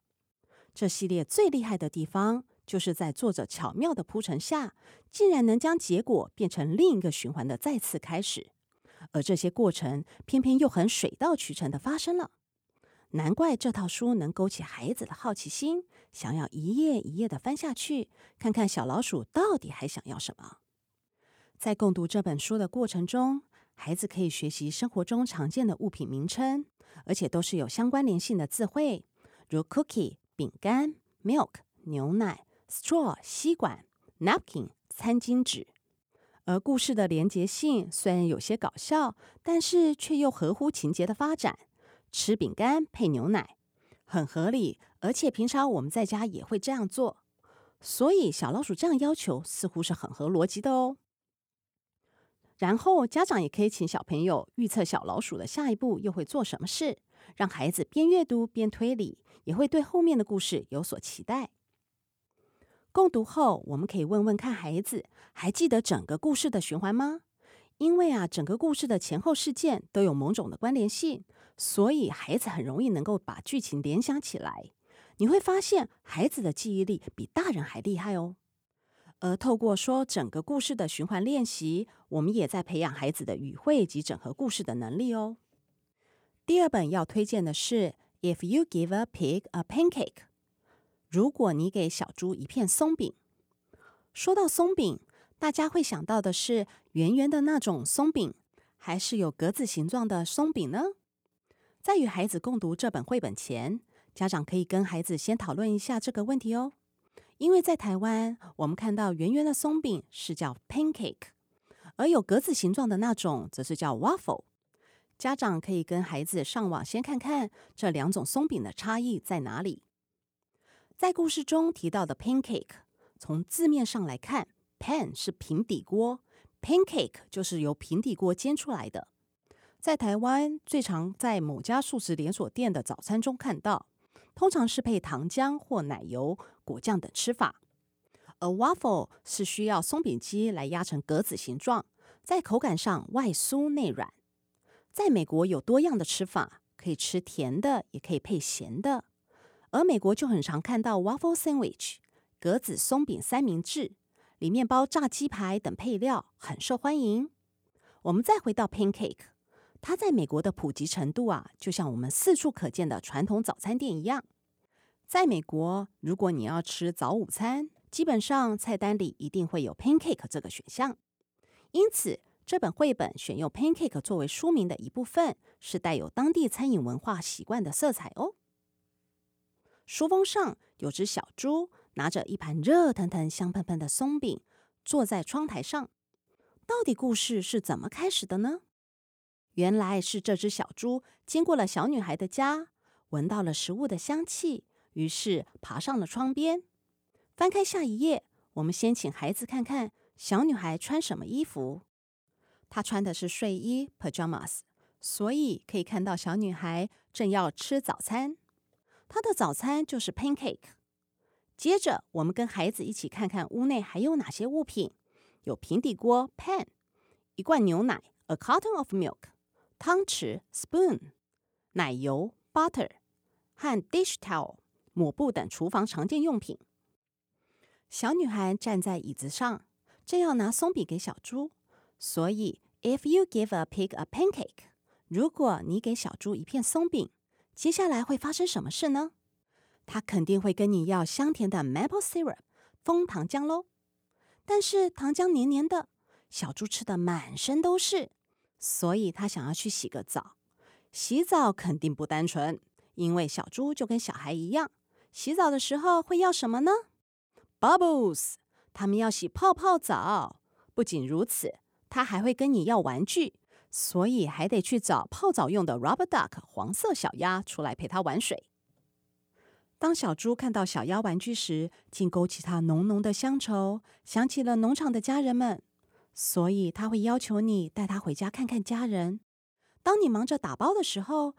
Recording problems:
none

